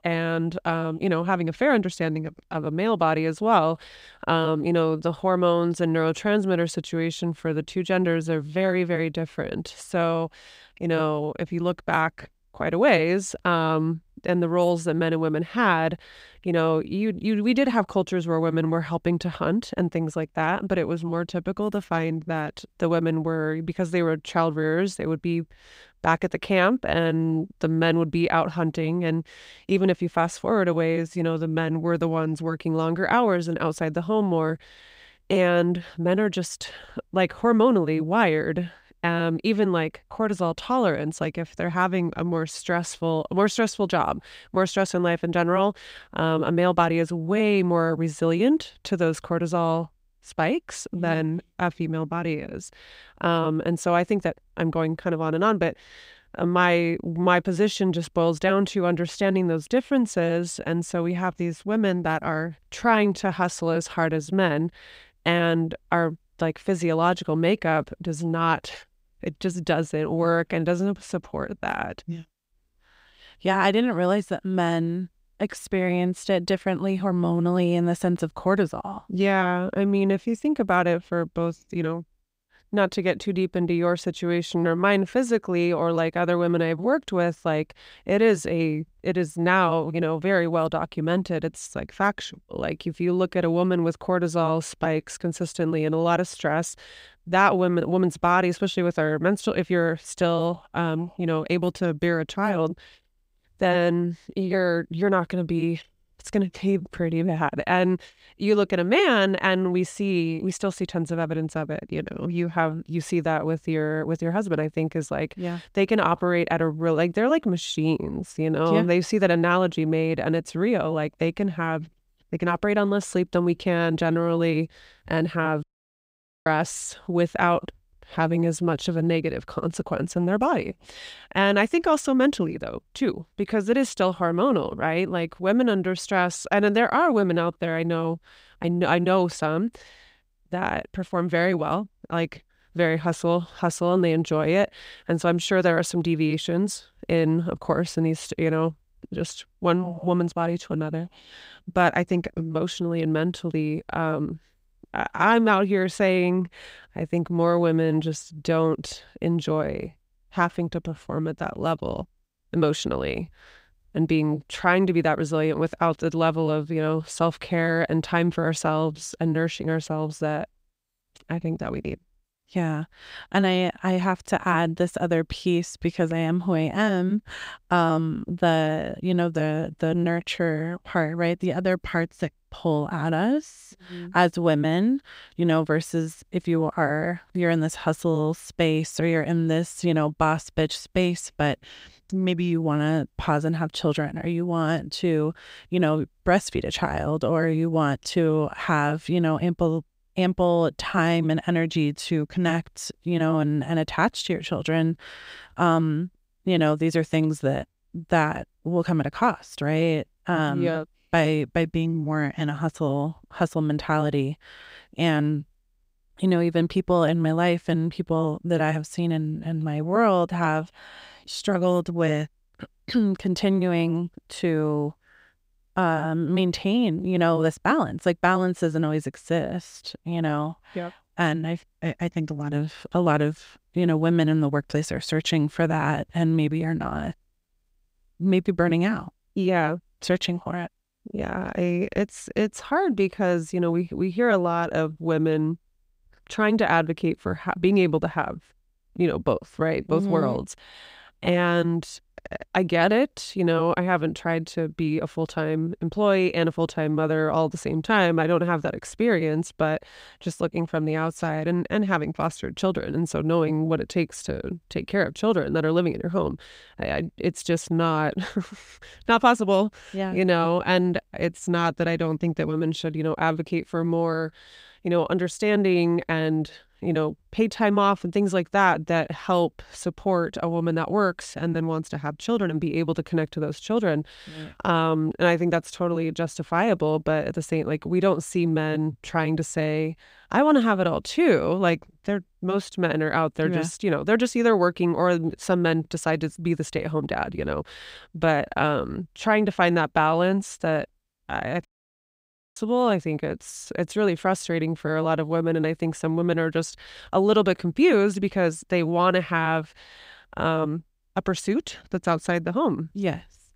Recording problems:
audio cutting out; at 2:06 for 1 s and at 5:02 for 1 s

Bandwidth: 15.5 kHz